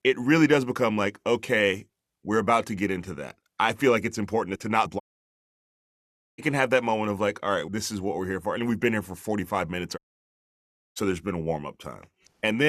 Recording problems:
audio cutting out; at 5 s for 1.5 s and at 10 s for 1 s
abrupt cut into speech; at the end

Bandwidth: 13.5 kHz